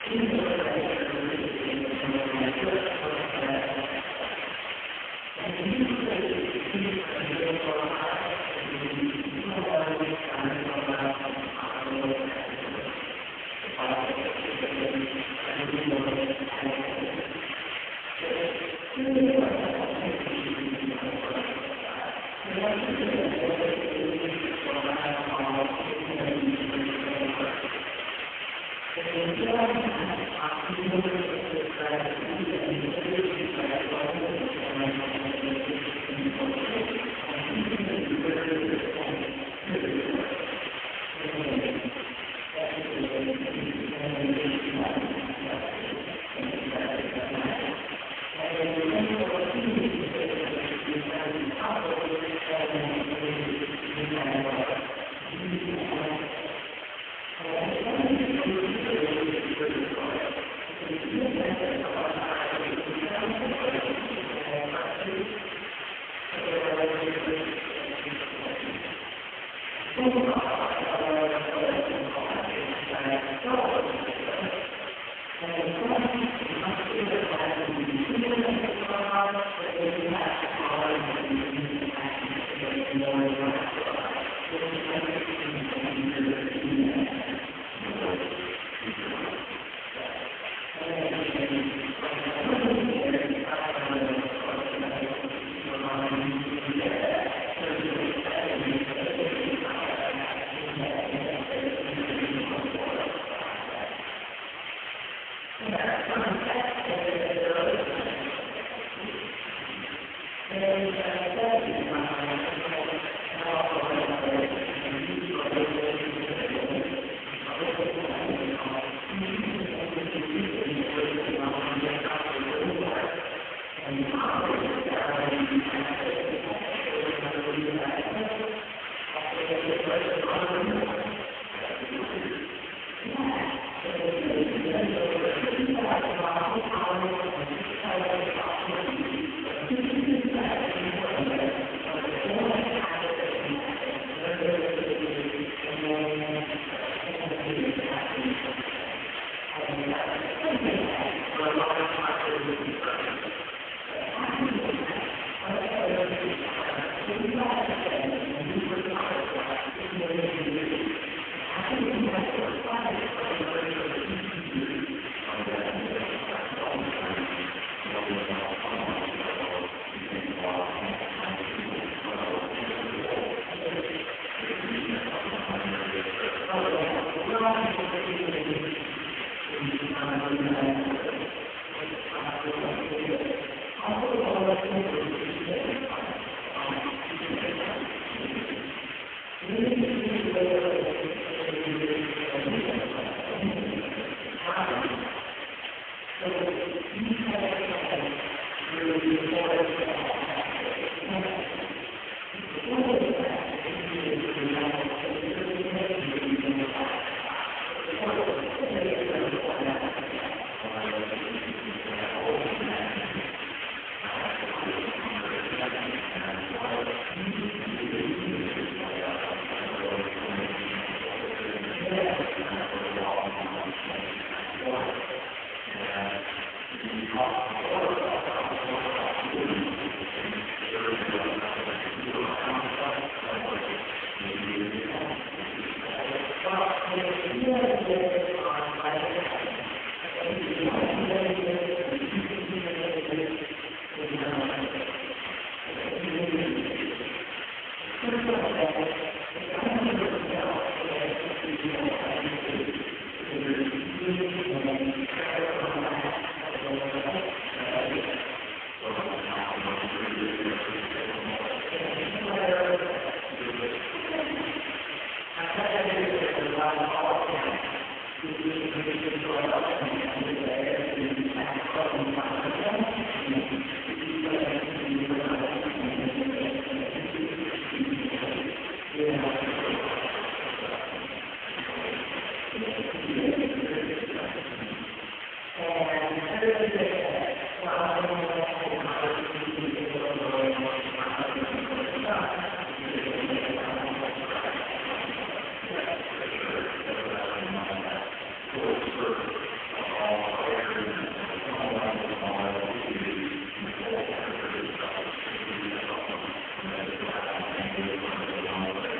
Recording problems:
phone-call audio; poor line
room echo; strong; dies away in 2.1 s
off-mic speech; far
hiss; loud; throughout; 5 dB below the speech

